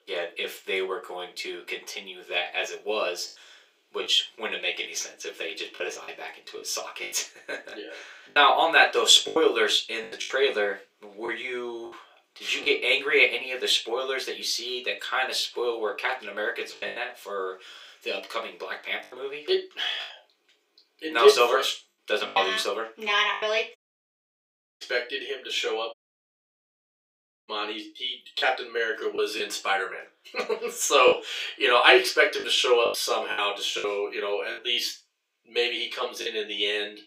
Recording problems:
off-mic speech; far
thin; very; fading below 350 Hz
room echo; very slight; dies away in 0.3 s
choppy; very; 5% of the speech affected
audio cutting out; at 24 s for 1 s and at 26 s for 1.5 s

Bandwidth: 15.5 kHz